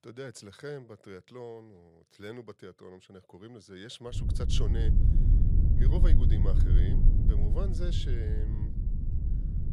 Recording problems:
low rumble; loud; from 4 s on; 1 dB below the speech

